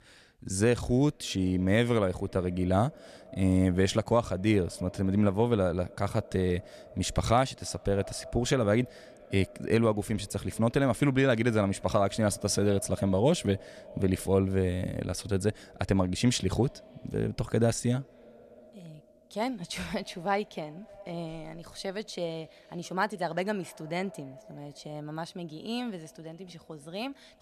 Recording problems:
echo of what is said; faint; throughout; 280 ms later, 20 dB below the speech

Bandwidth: 14 kHz